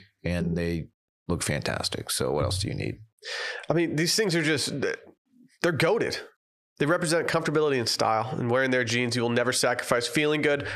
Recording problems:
squashed, flat; heavily

